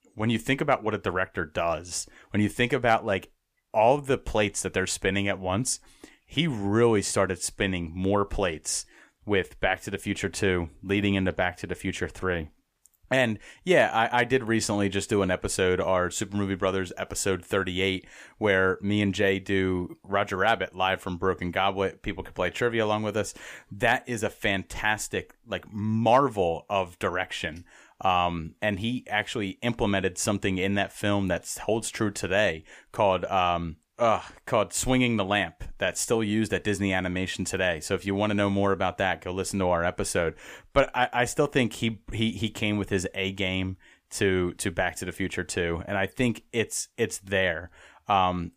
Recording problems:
none

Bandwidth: 15 kHz